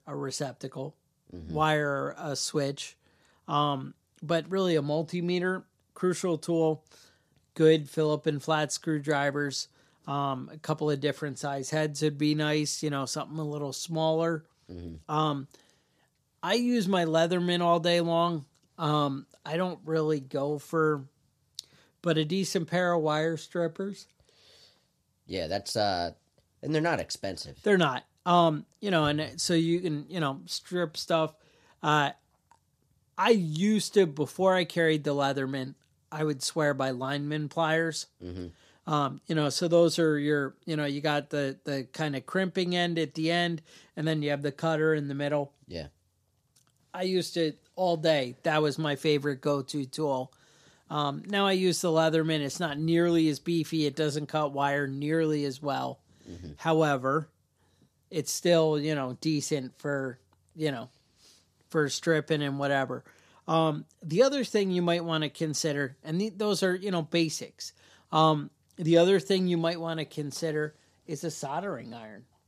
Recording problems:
none

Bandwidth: 14.5 kHz